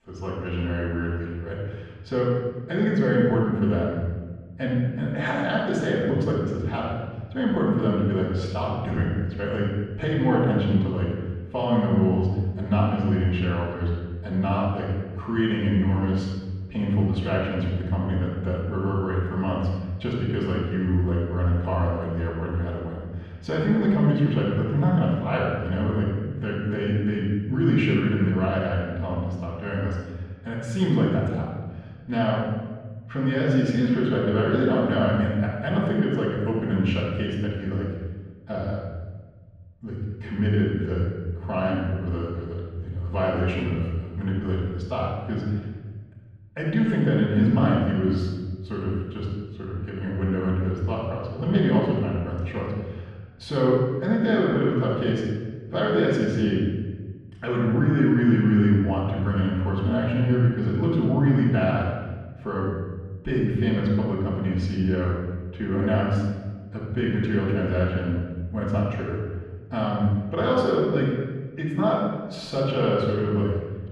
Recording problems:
off-mic speech; far
room echo; noticeable; dies away in 1.3 s
muffled; slightly; fading above 2.5 kHz

